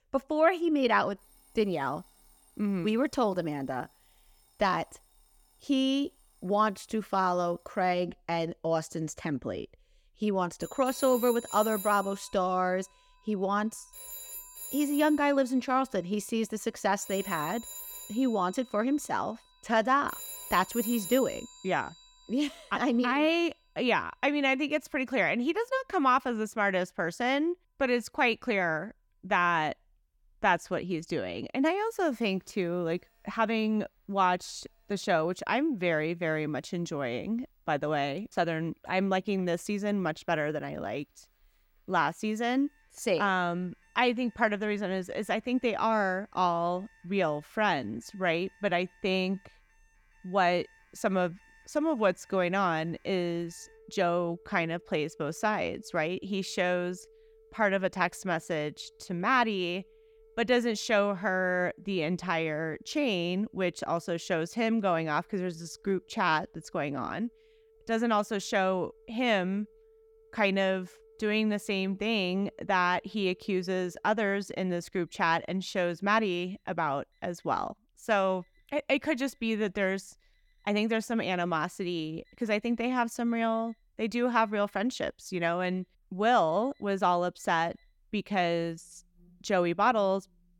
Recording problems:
alarms or sirens; noticeable; throughout; 15 dB below the speech

